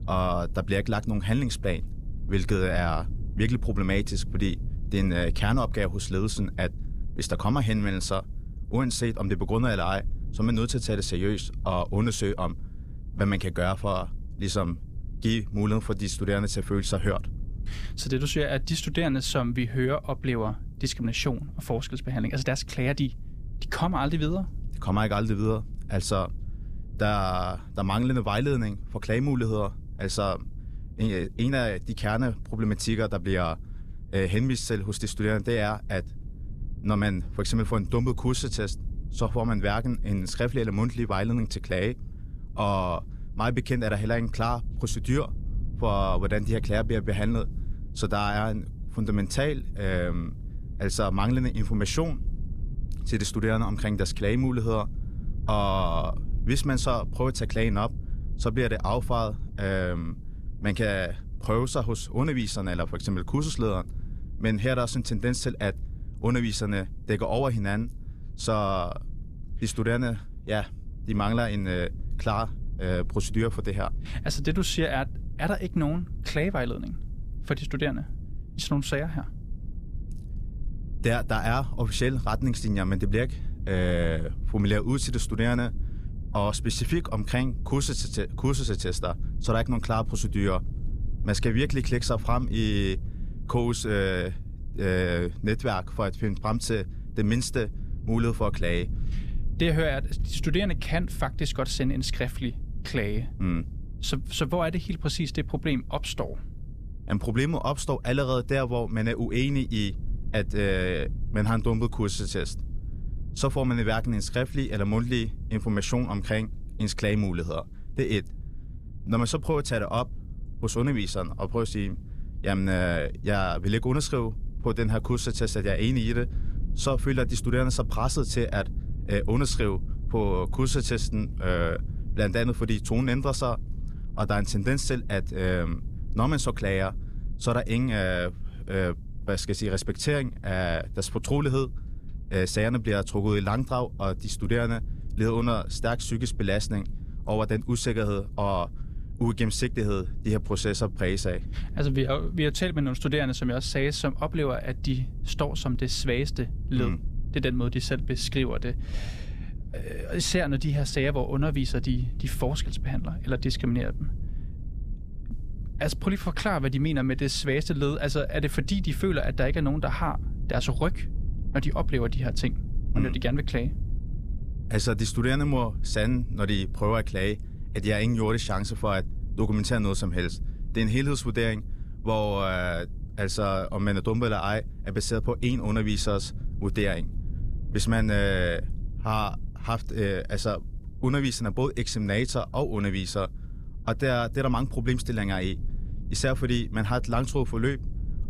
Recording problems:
low rumble; faint; throughout; 20 dB below the speech

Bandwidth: 14.5 kHz